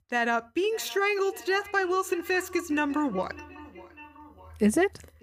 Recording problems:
echo of what is said; faint; throughout; 600 ms later, 20 dB below the speech

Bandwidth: 15 kHz